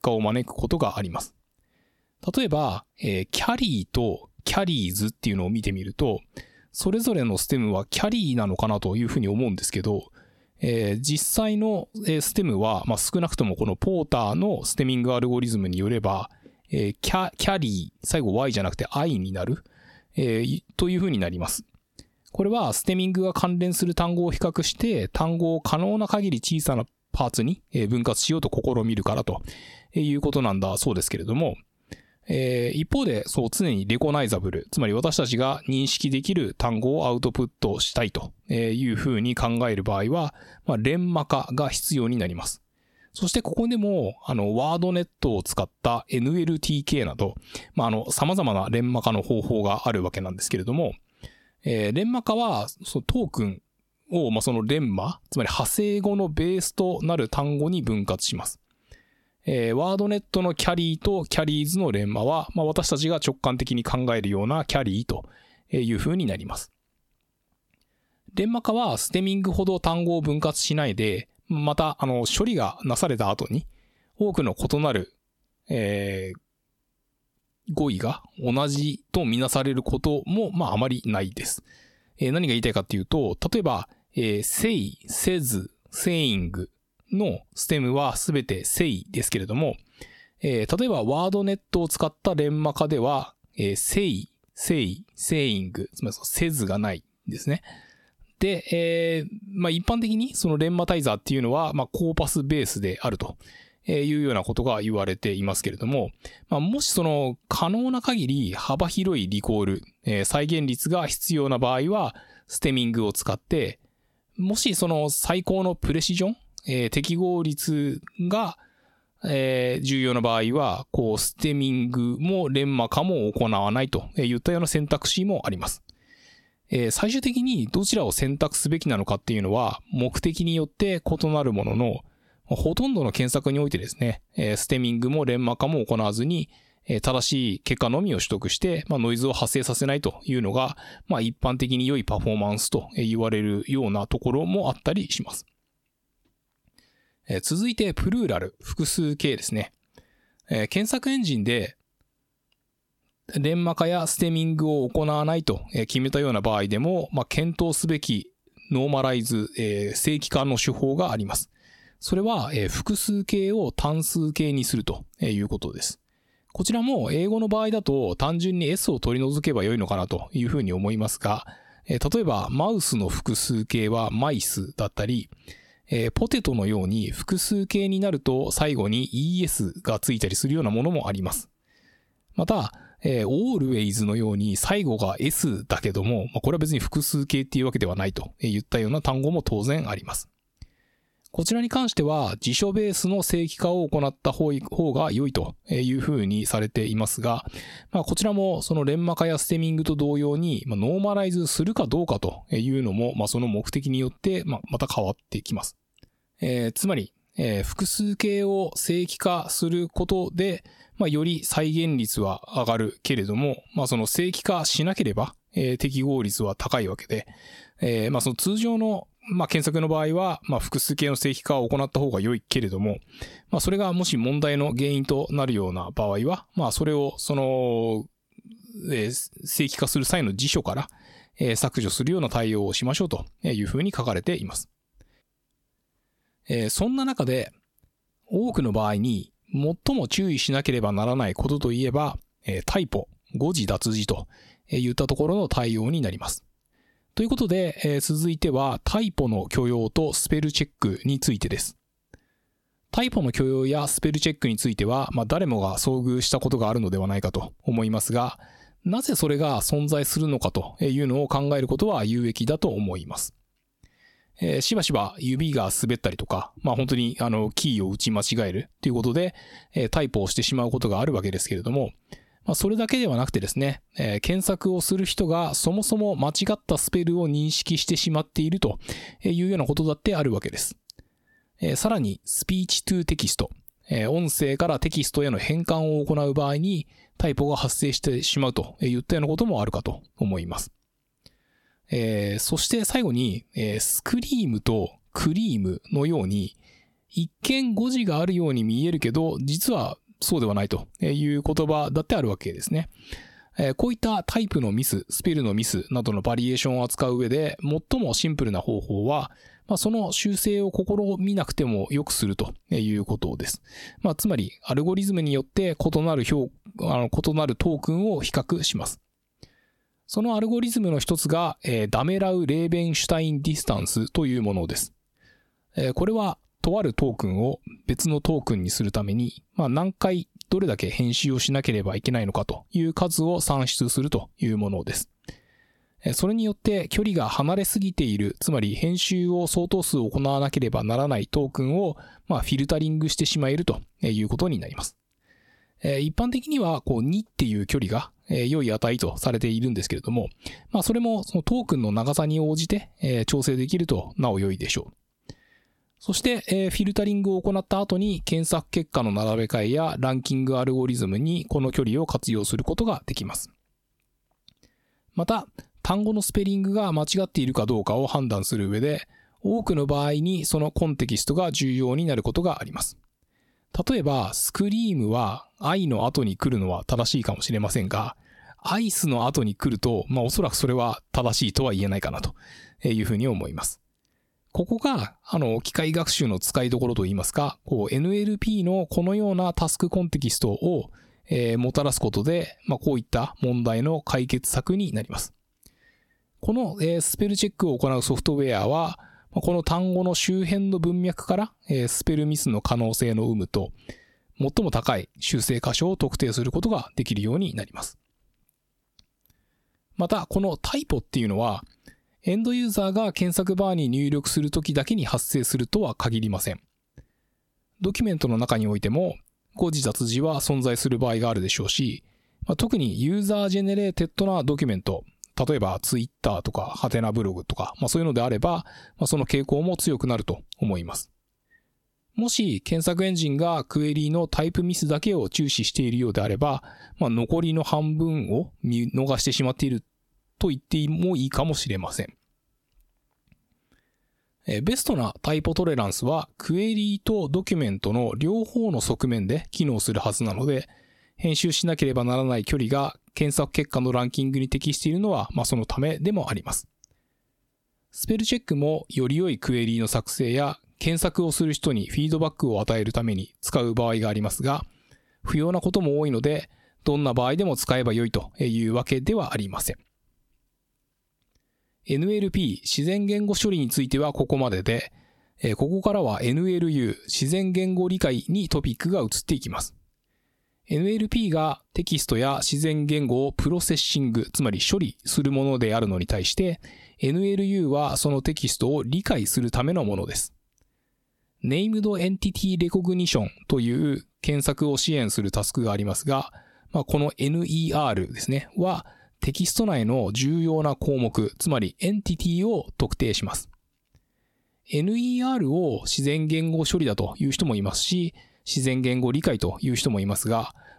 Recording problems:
squashed, flat; heavily

